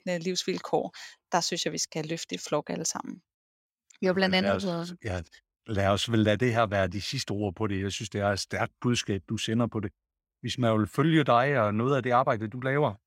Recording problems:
none

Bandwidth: 16 kHz